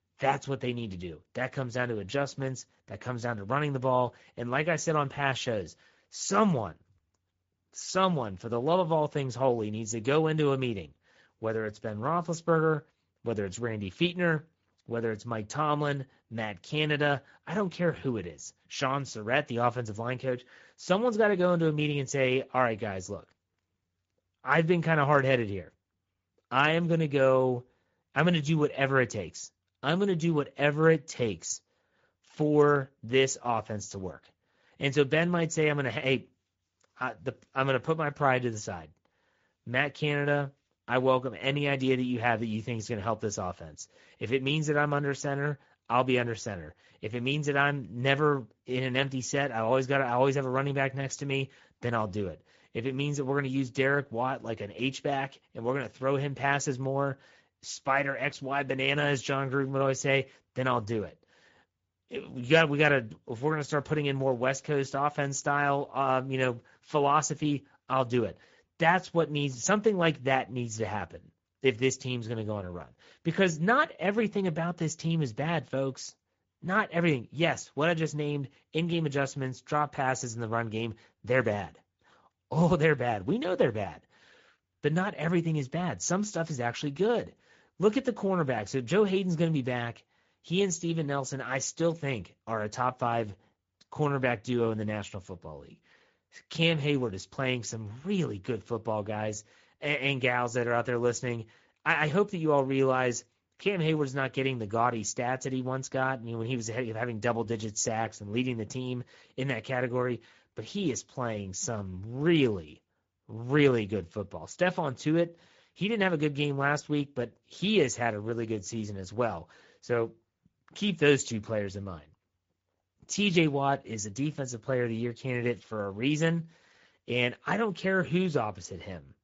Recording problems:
garbled, watery; slightly; nothing above 7.5 kHz

